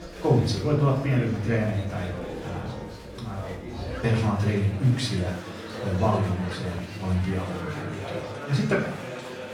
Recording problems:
off-mic speech; far
room echo; noticeable; dies away in 0.5 s
chatter from many people; noticeable; throughout; 10 dB below the speech
background music; faint; throughout; 25 dB below the speech

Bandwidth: 17.5 kHz